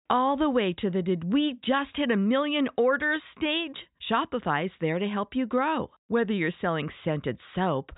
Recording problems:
high frequencies cut off; severe; nothing above 4 kHz

